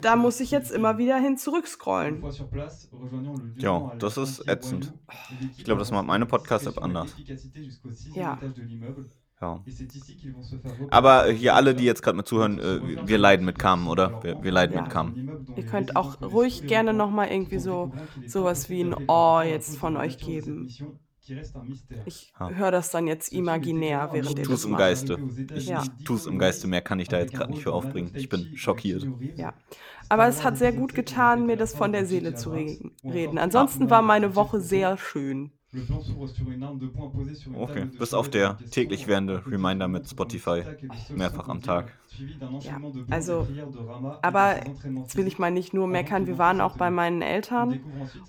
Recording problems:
voice in the background; noticeable; throughout; 10 dB below the speech

